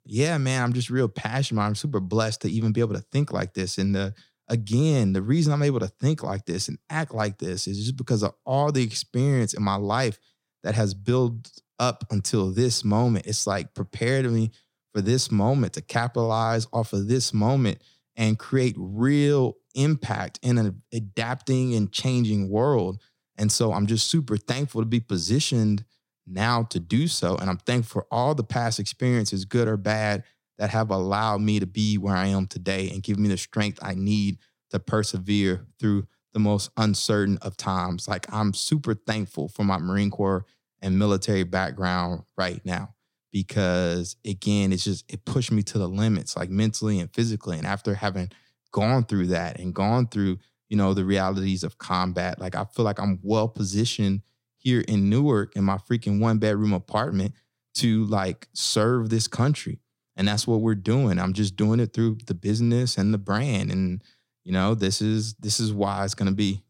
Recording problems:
none

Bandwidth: 16.5 kHz